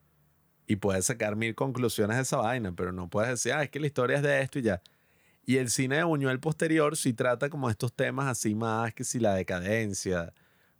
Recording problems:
none

